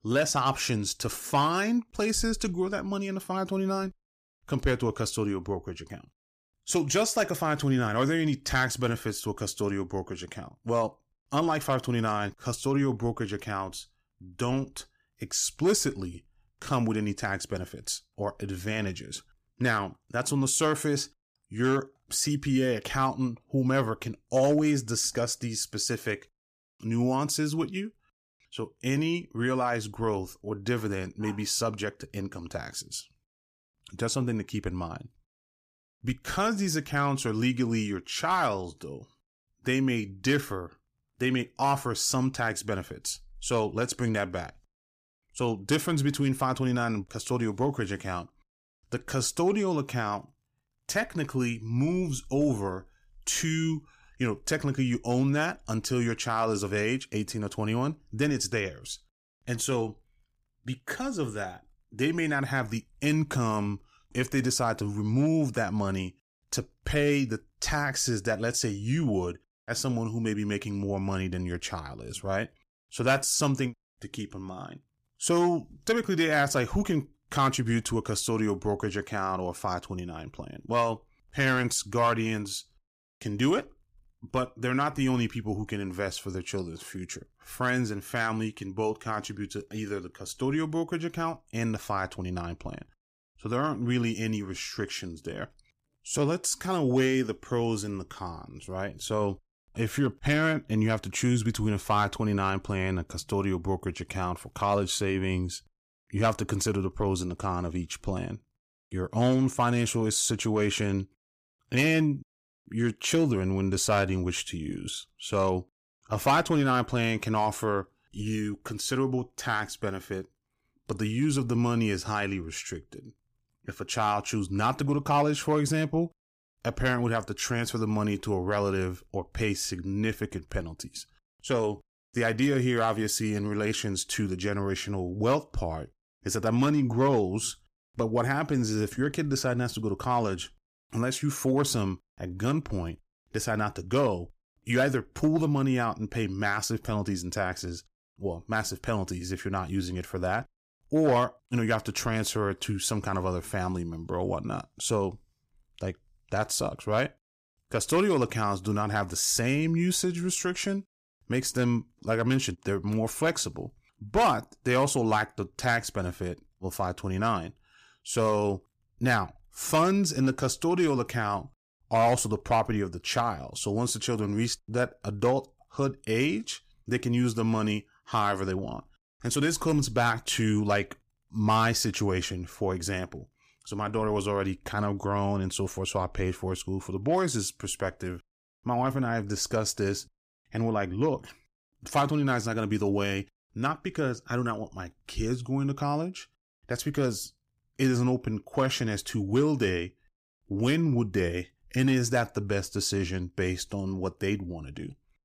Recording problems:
none

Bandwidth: 15 kHz